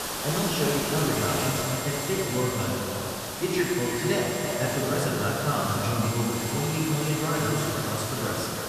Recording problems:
echo of what is said; strong; throughout; 330 ms later, 8 dB below the speech
off-mic speech; far
room echo; noticeable; dies away in 1.7 s
hiss; loud; throughout; 3 dB below the speech
high-pitched whine; noticeable; from 1 to 2.5 s, from 3.5 to 5 s and from 6 to 7.5 s; 2 kHz, 10 dB below the speech

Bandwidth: 14.5 kHz